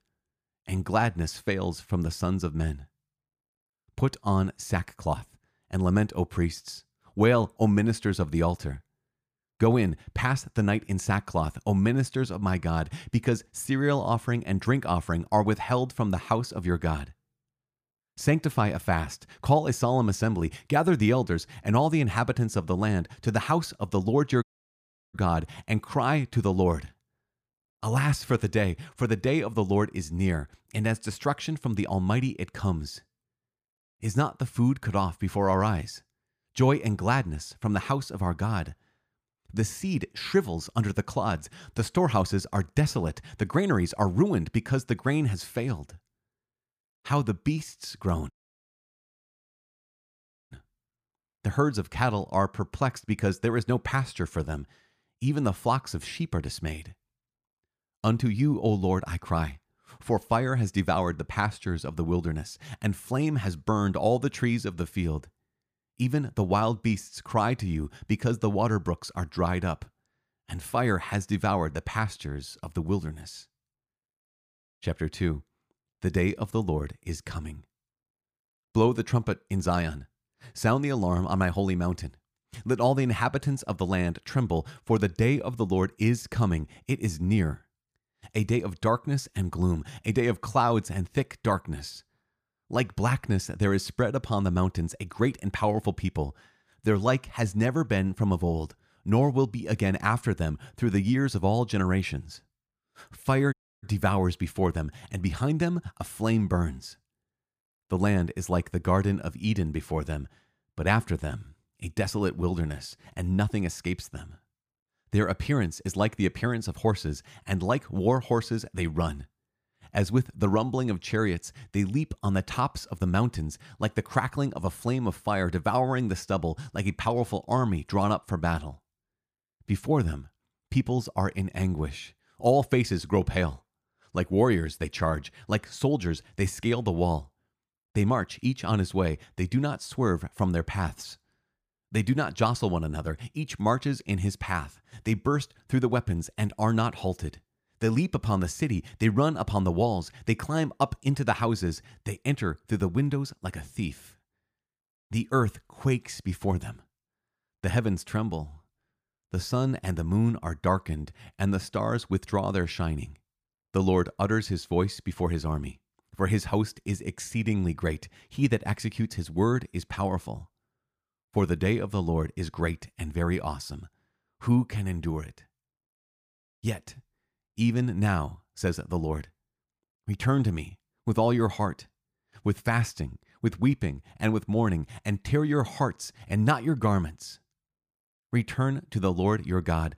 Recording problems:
audio cutting out; at 24 s for 0.5 s, at 48 s for 2 s and at 1:44

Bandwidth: 15 kHz